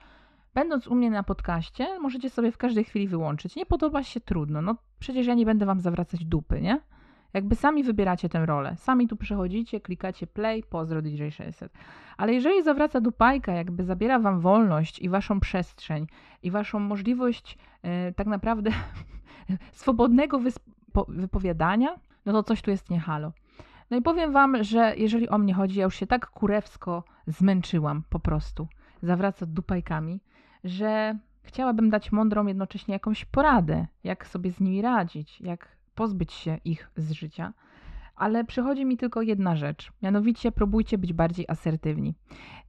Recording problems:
muffled; slightly; fading above 3.5 kHz

